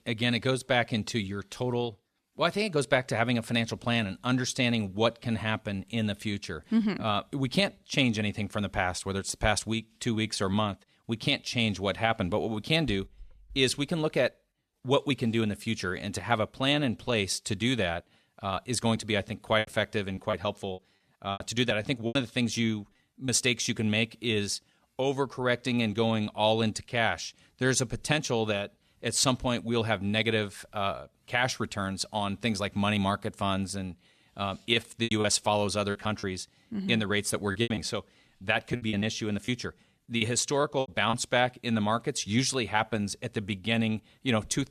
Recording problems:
choppy; very; from 20 to 23 s, from 35 to 36 s and from 38 to 41 s; 14% of the speech affected

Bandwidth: 13.5 kHz